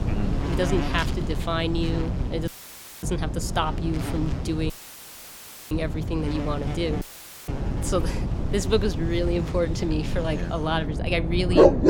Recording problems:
wind noise on the microphone; heavy; 10 dB below the speech
animal sounds; loud; throughout; 3 dB below the speech
electrical hum; faint; throughout; 60 Hz, 25 dB below the speech
audio cutting out; filled with static; at 2.5 s for 0.5 s, at 4.5 s for 1 s and at 7 s

